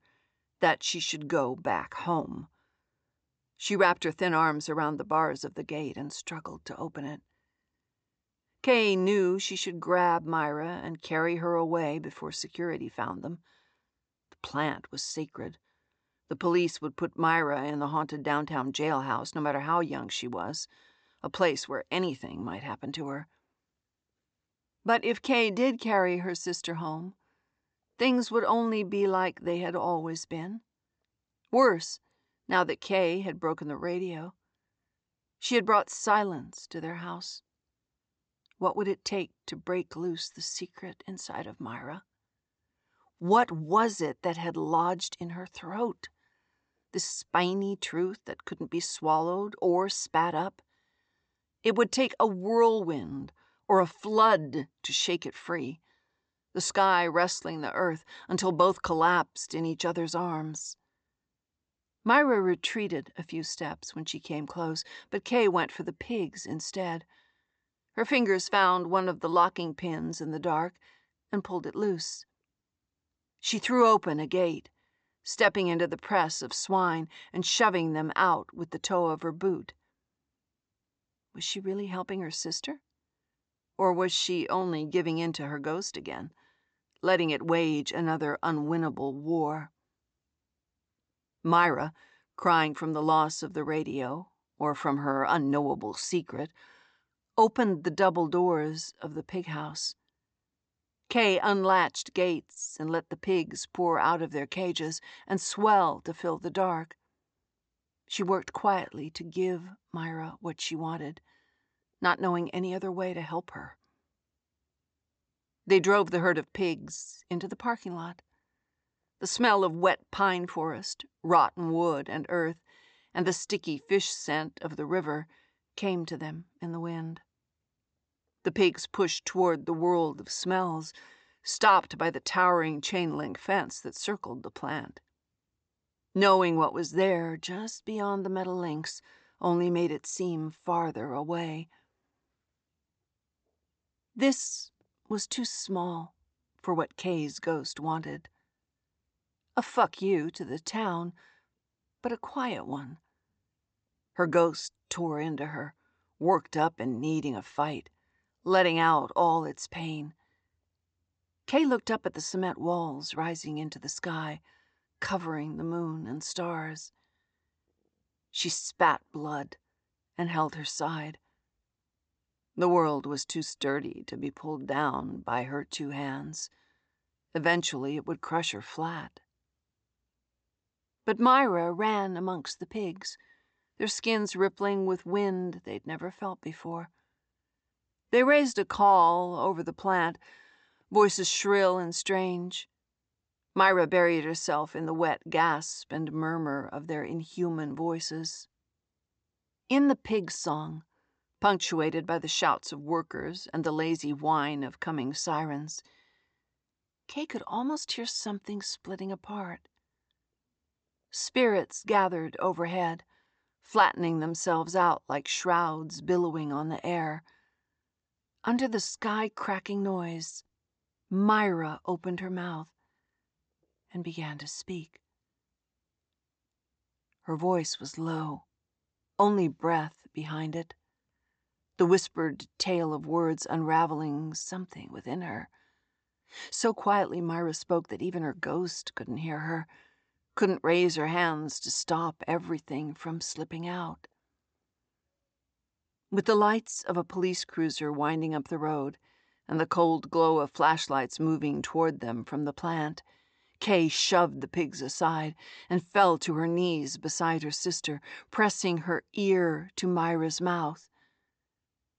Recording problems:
high frequencies cut off; noticeable; nothing above 8 kHz

